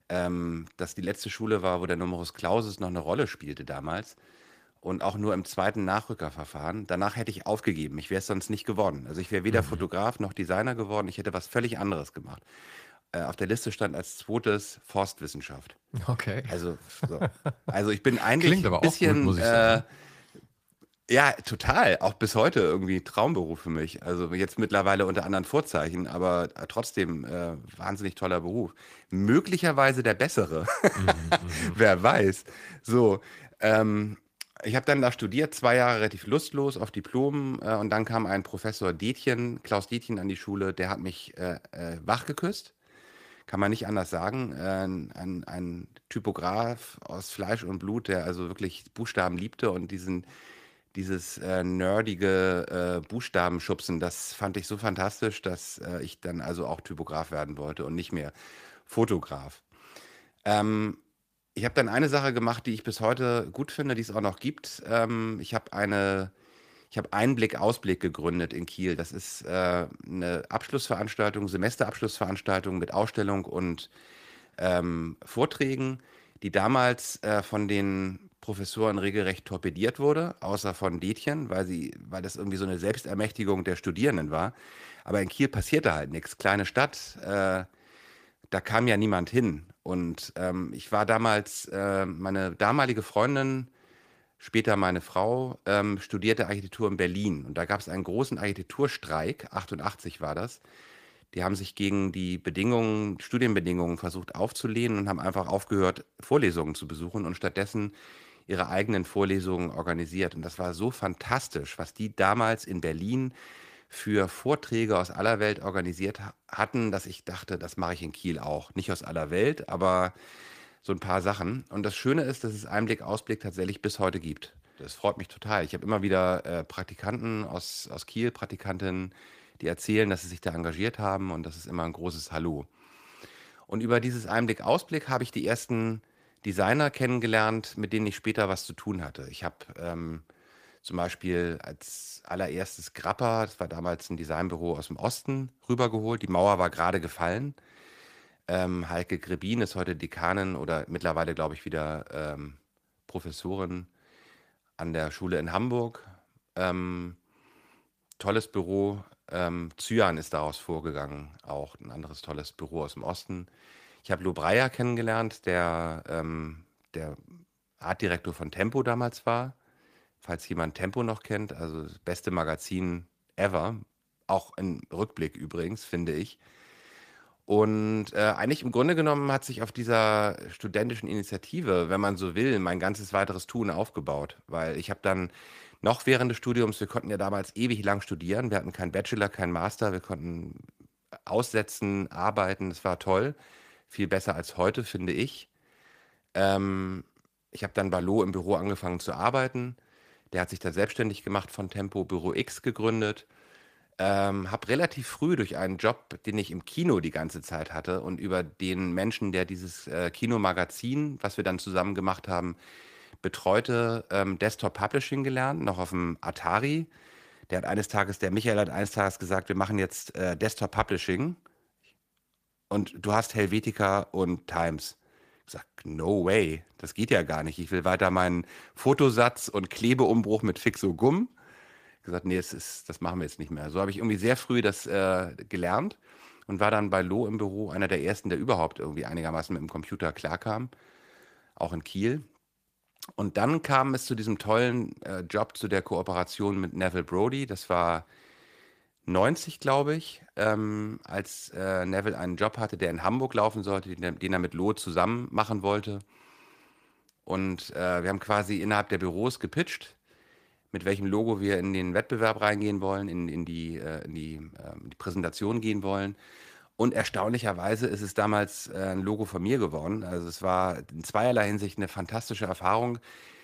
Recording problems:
garbled, watery; slightly; nothing above 15 kHz

